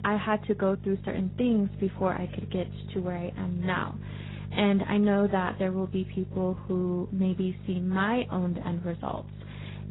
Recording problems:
garbled, watery; badly; nothing above 4 kHz
electrical hum; noticeable; throughout; 50 Hz, 20 dB below the speech

